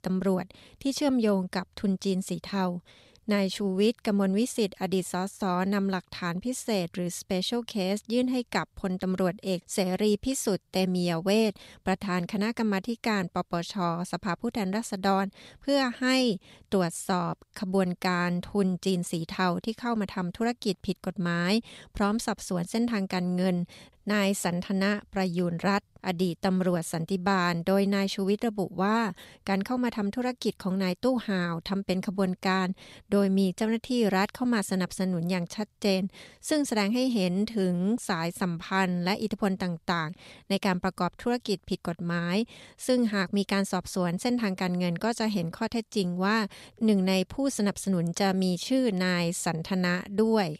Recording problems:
none

